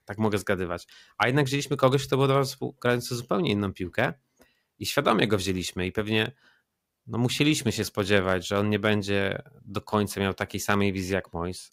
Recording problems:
none

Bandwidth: 15.5 kHz